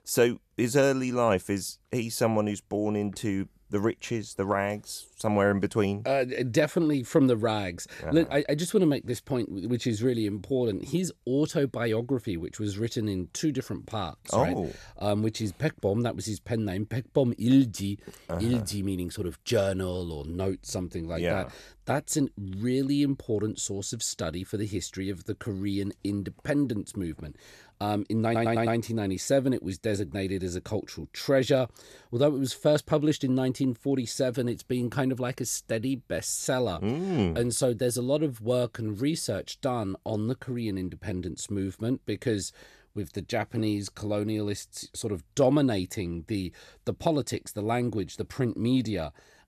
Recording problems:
audio stuttering; at 28 s

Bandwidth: 13.5 kHz